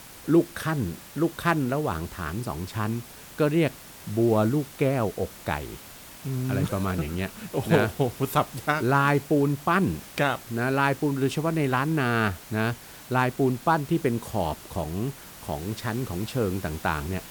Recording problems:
hiss; noticeable; throughout; 15 dB below the speech

